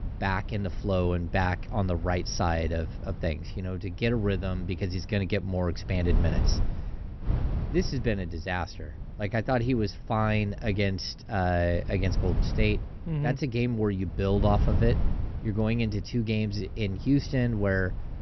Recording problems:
high frequencies cut off; noticeable; nothing above 6 kHz
wind noise on the microphone; occasional gusts; 15 dB below the speech

